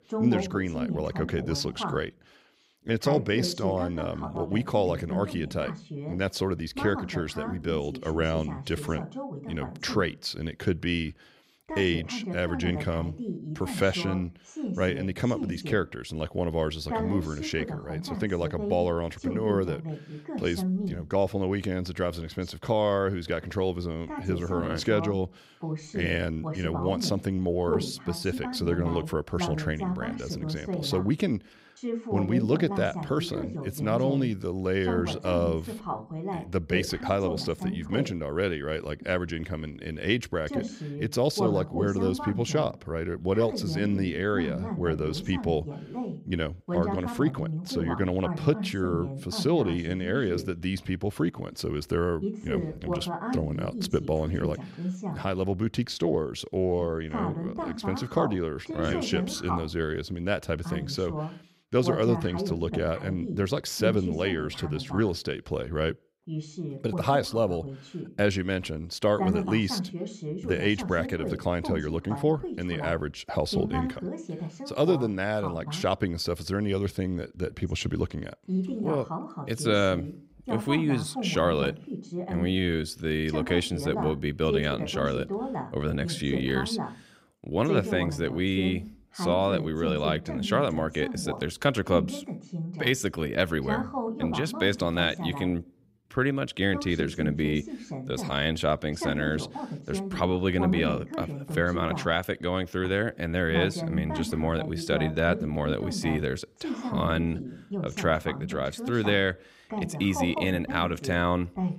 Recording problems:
voice in the background; loud; throughout; 6 dB below the speech

